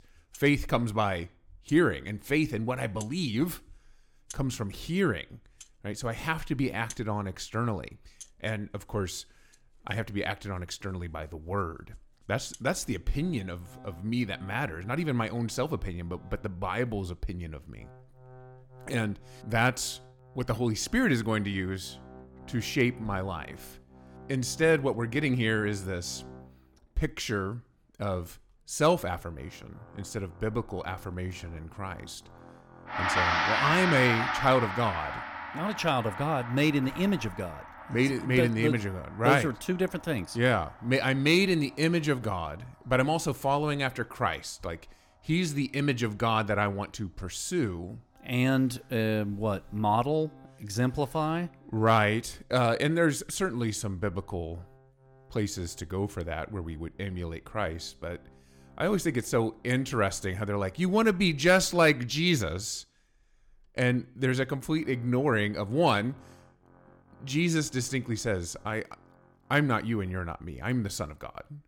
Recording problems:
background music; loud; throughout; 7 dB below the speech

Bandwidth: 17 kHz